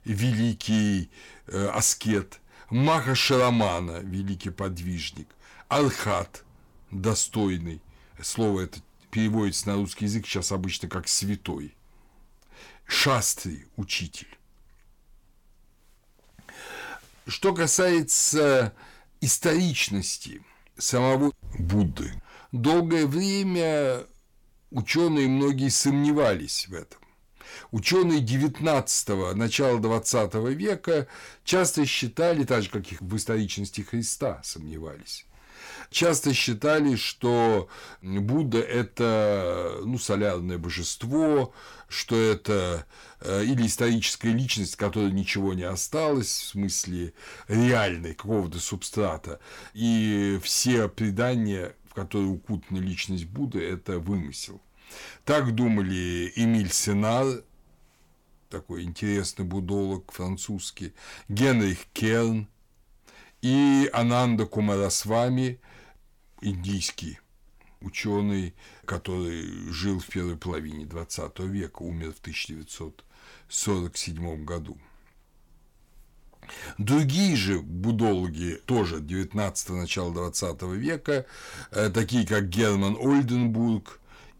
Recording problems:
distortion; slight; 10 dB below the speech

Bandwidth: 17 kHz